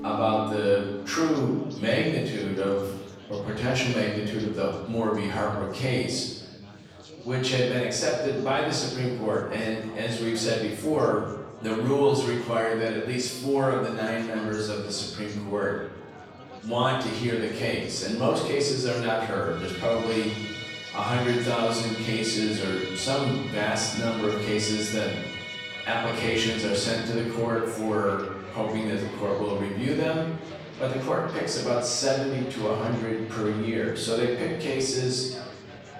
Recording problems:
off-mic speech; far
room echo; noticeable; dies away in 0.9 s
background music; loud; throughout; 10 dB below the speech
chatter from many people; noticeable; throughout; 20 dB below the speech

